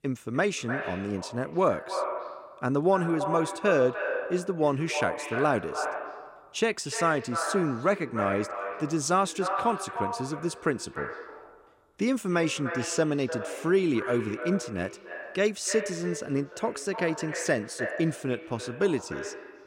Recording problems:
echo of what is said; strong; throughout; 300 ms later, 7 dB below the speech

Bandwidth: 16 kHz